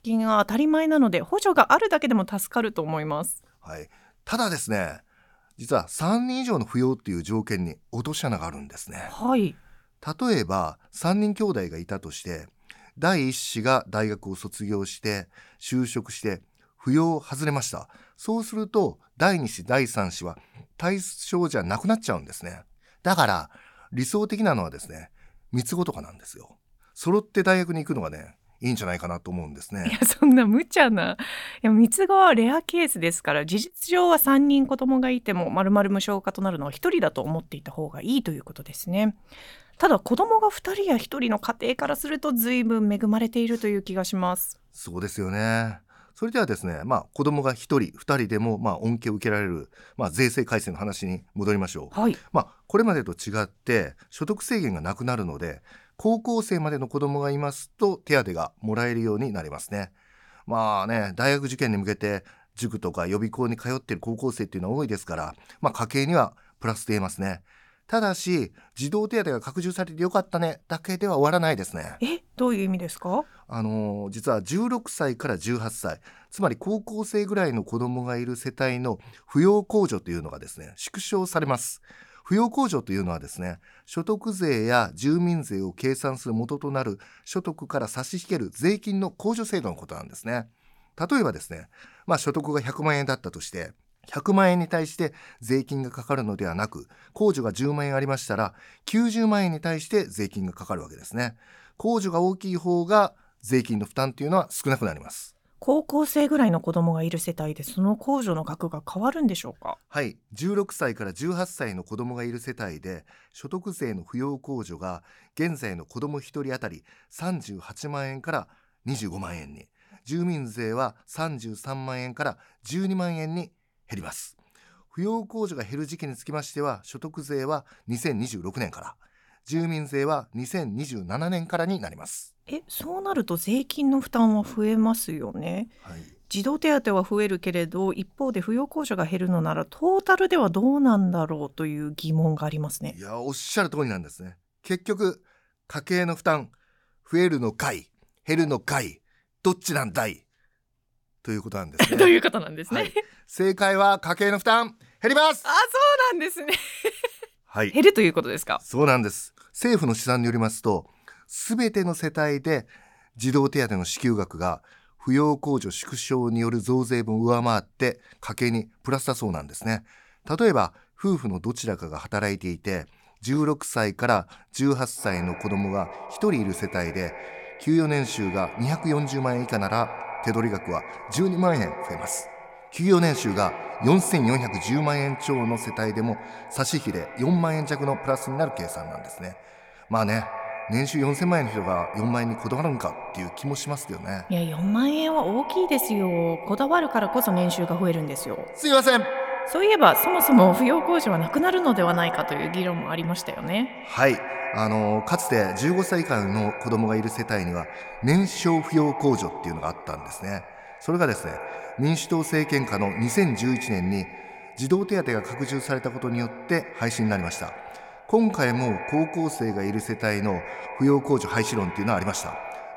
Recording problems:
echo of what is said; strong; from 2:55 on; 100 ms later, 10 dB below the speech

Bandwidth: 18 kHz